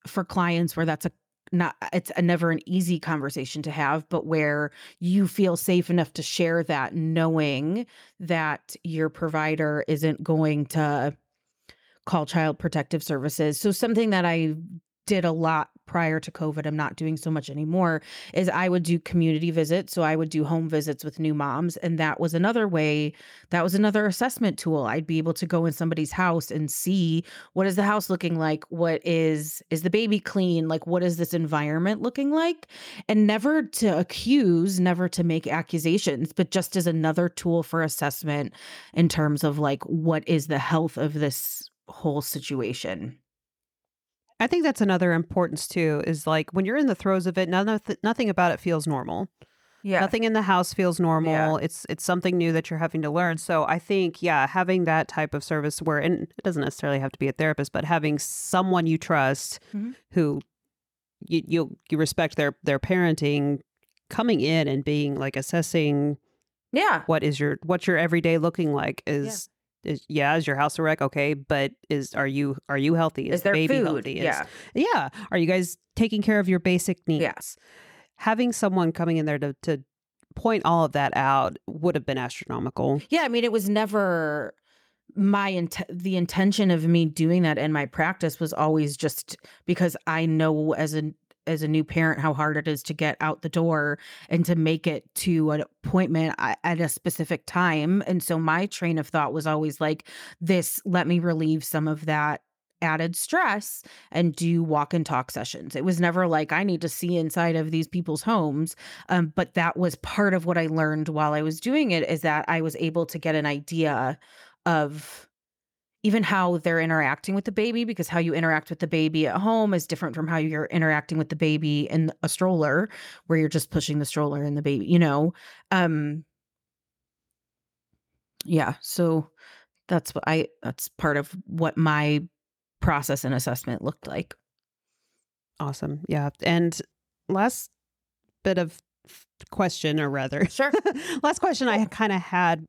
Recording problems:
none

